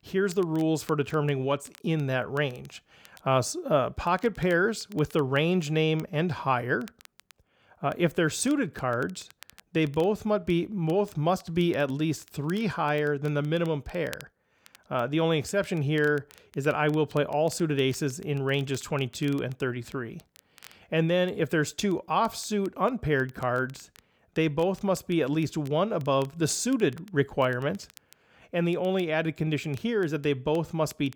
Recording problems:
crackle, like an old record; faint; 25 dB below the speech

